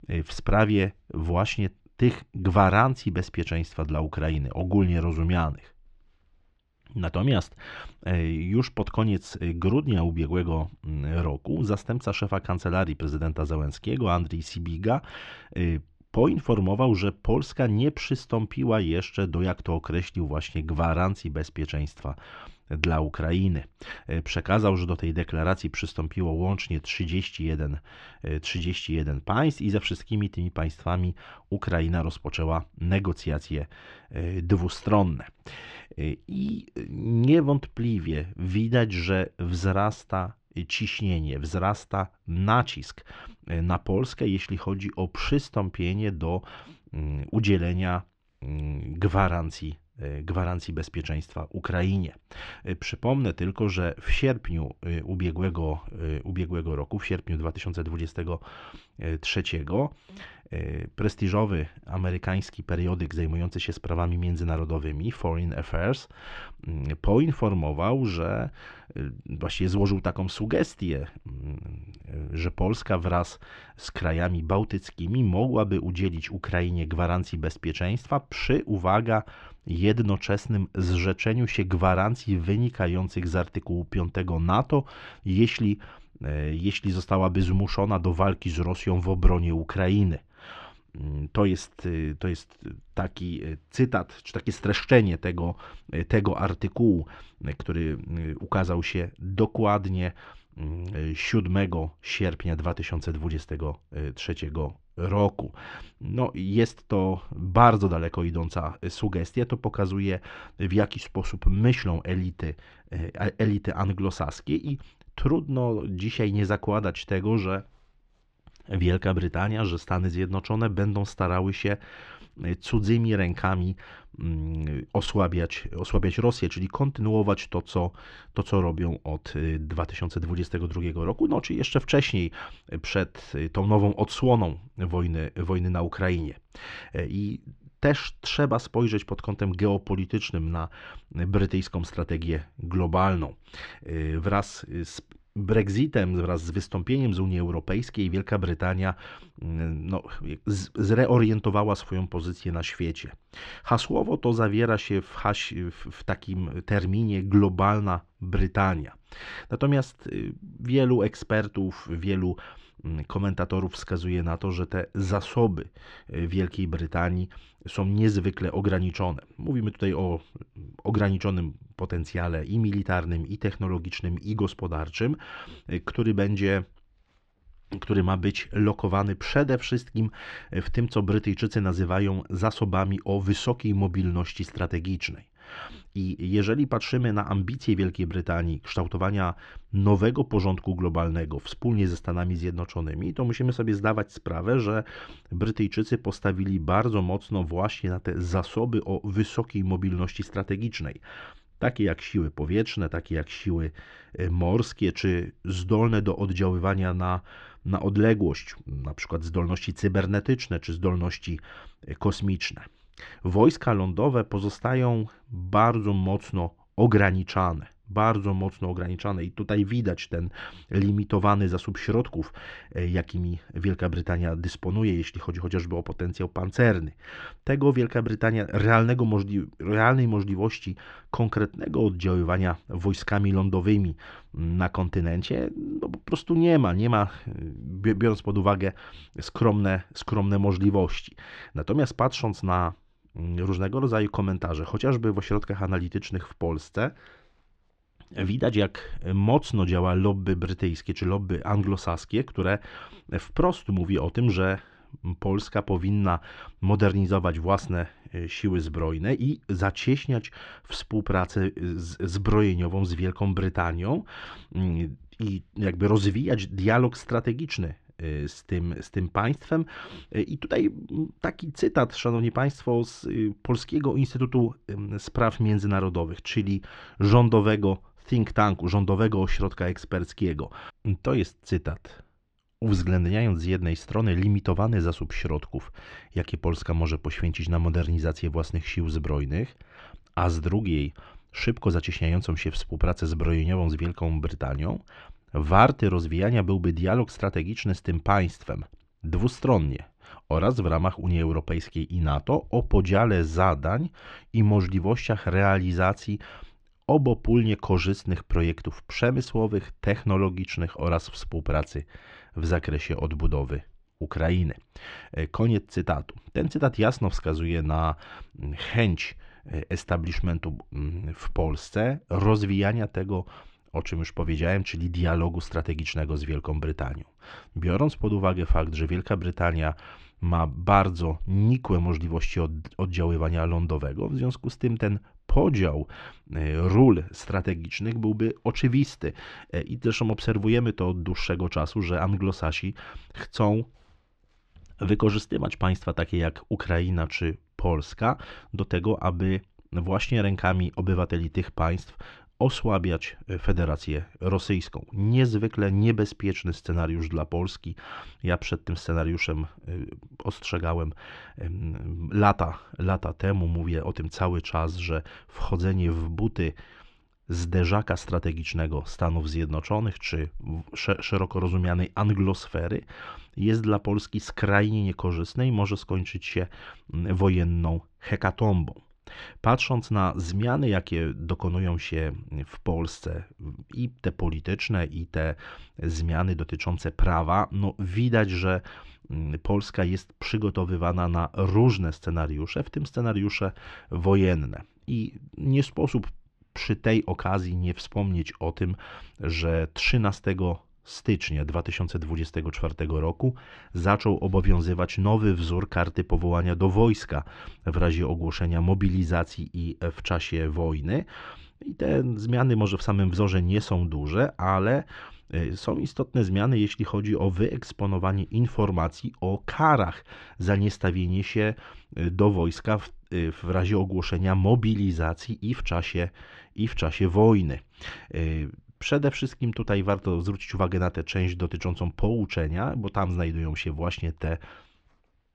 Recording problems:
muffled; slightly; fading above 4 kHz

